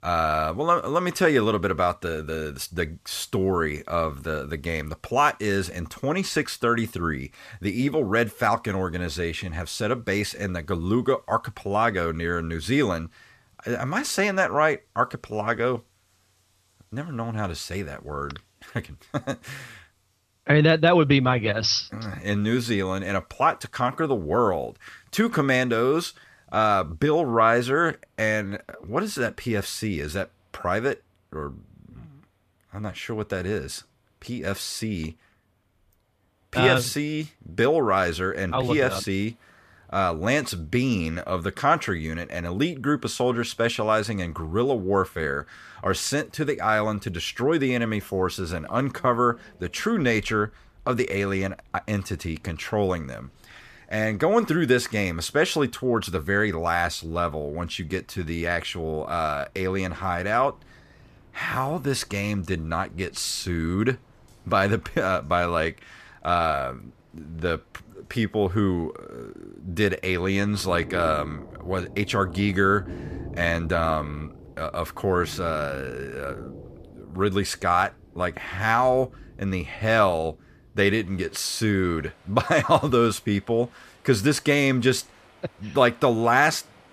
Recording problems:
rain or running water; faint; throughout; 20 dB below the speech

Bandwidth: 14.5 kHz